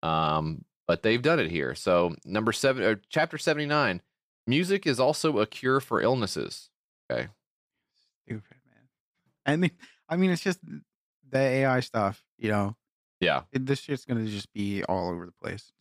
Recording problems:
none

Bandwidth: 15 kHz